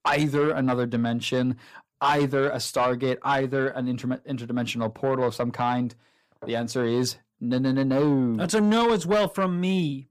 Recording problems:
distortion; slight; 10 dB below the speech

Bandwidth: 15 kHz